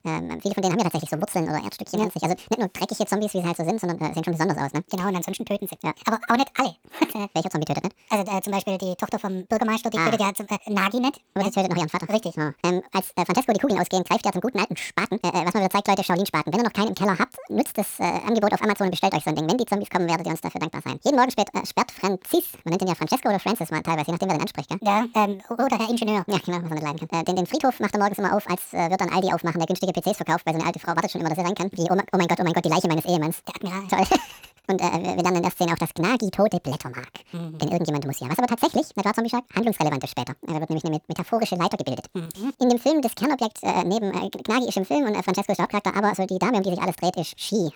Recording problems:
wrong speed and pitch; too fast and too high; 1.7 times normal speed

